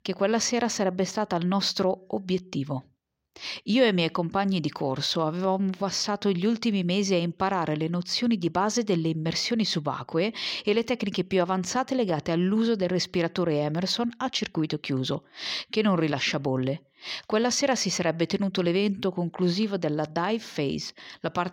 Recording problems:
none

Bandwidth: 16 kHz